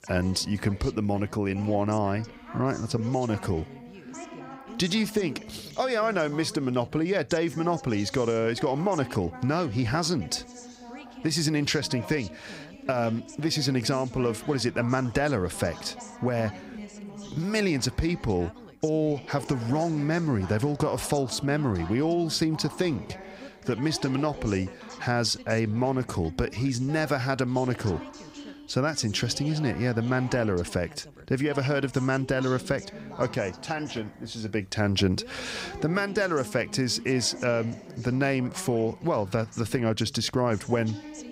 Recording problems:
background chatter; noticeable; throughout; 2 voices, 15 dB below the speech

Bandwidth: 15.5 kHz